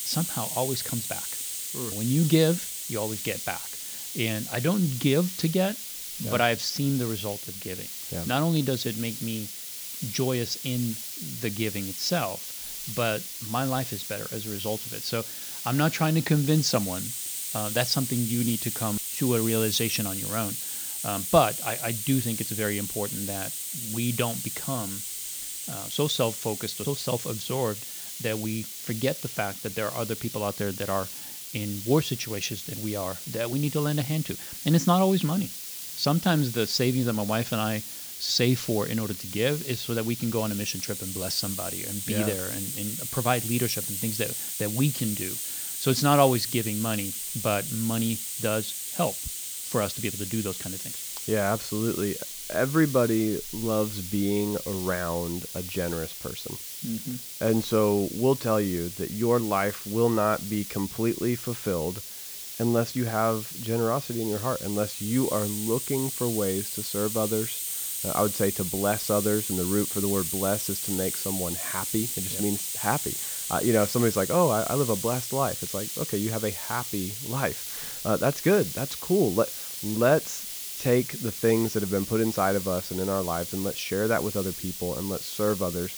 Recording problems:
high frequencies cut off; noticeable; nothing above 8 kHz
hiss; loud; throughout; 5 dB below the speech

